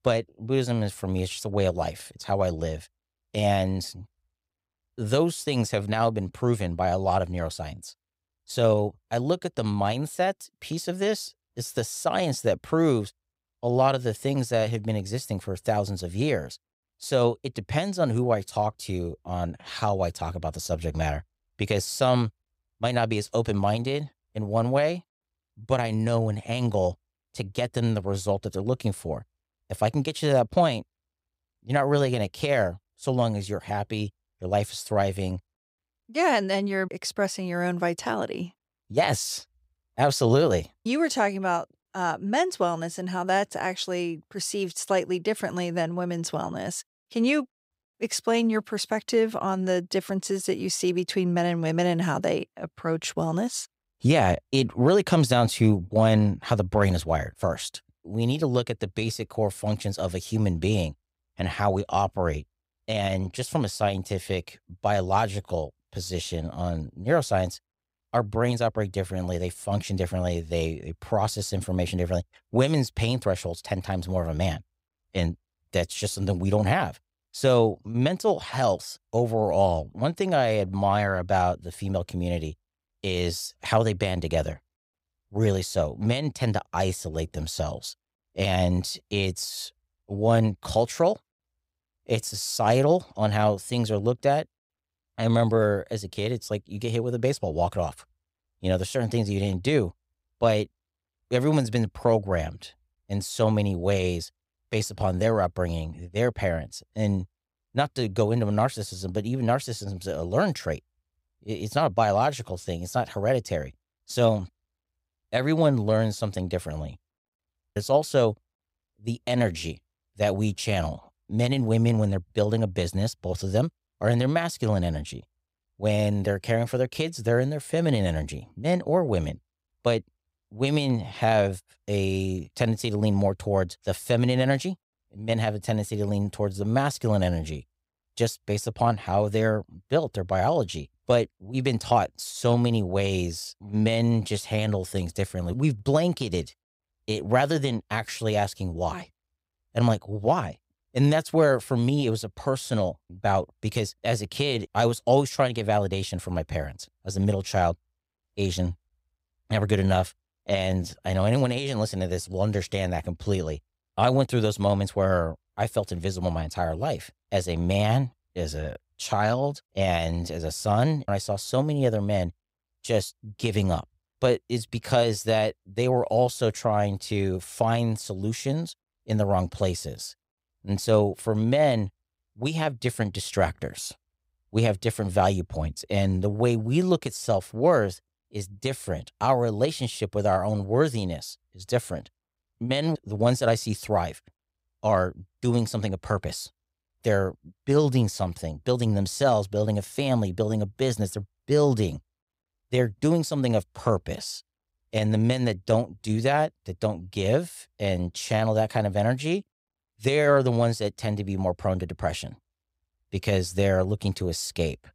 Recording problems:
none

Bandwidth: 15.5 kHz